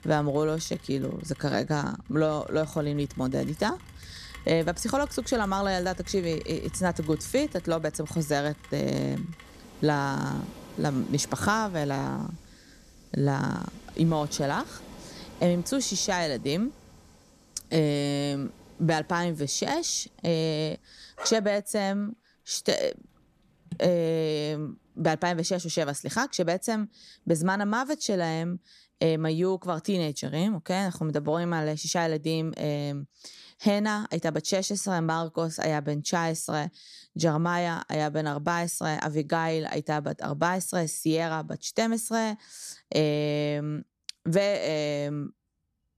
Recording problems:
rain or running water; noticeable; throughout; 20 dB below the speech

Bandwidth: 14 kHz